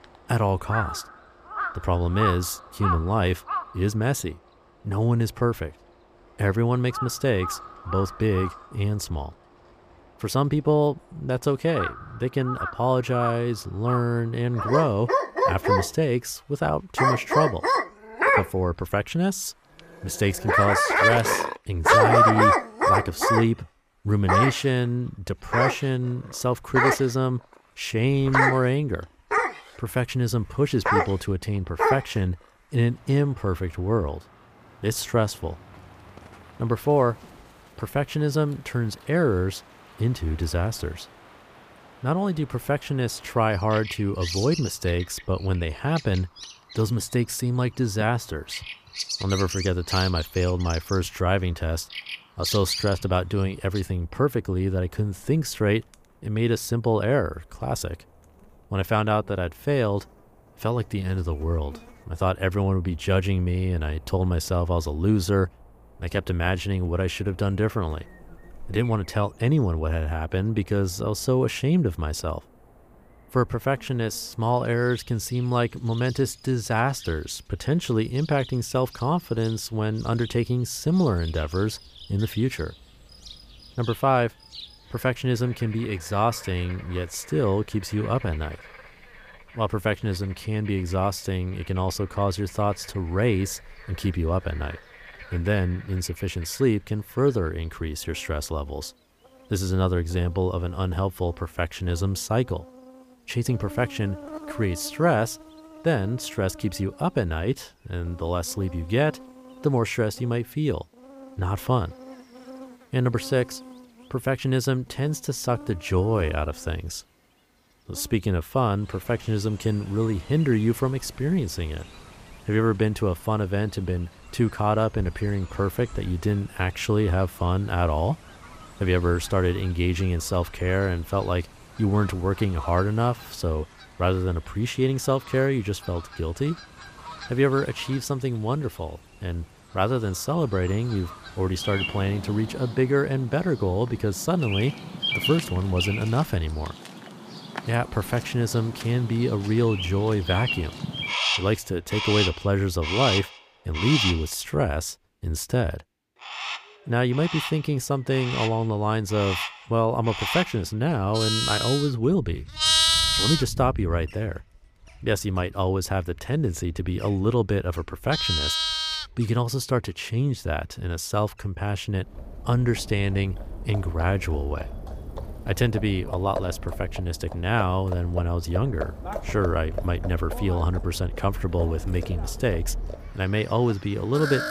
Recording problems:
animal sounds; loud; throughout; 2 dB below the speech

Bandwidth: 15 kHz